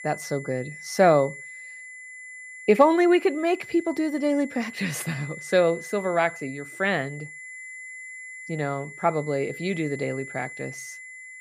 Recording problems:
high-pitched whine; noticeable; throughout; 2 kHz, 15 dB below the speech

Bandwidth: 15 kHz